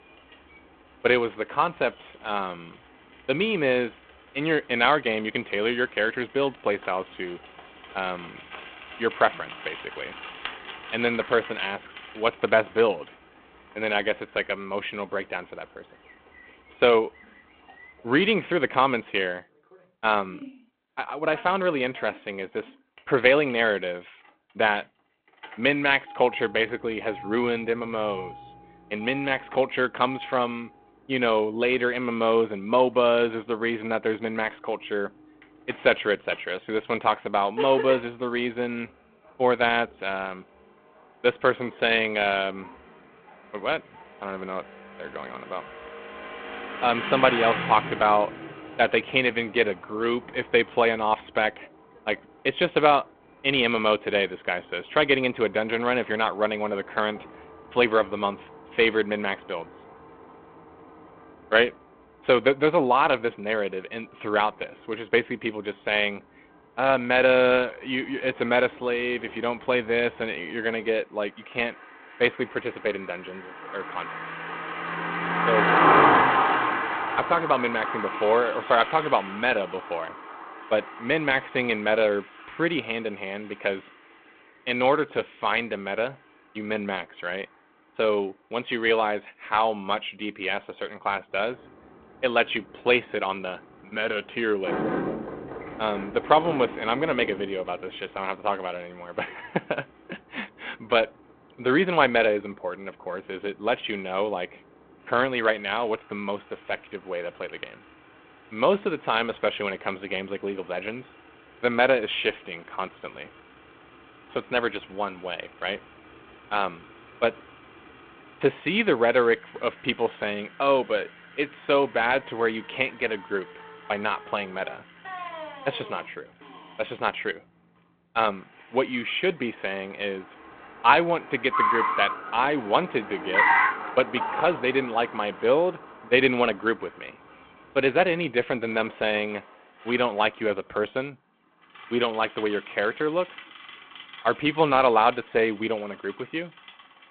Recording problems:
phone-call audio
traffic noise; loud; throughout; 4 dB below the speech

